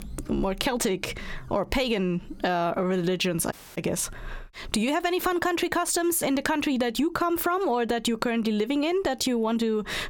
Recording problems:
squashed, flat; heavily
audio cutting out; at 3.5 s

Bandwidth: 17 kHz